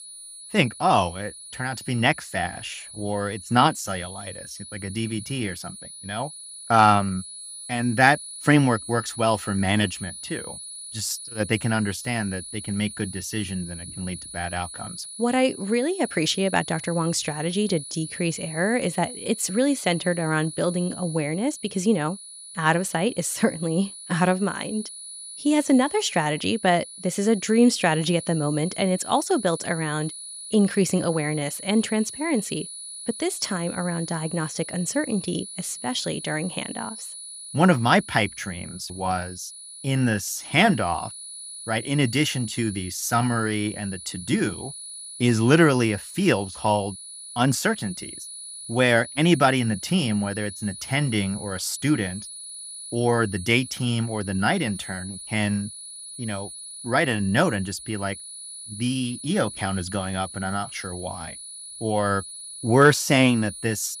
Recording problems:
high-pitched whine; noticeable; throughout; 10 kHz, 10 dB below the speech

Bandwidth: 15.5 kHz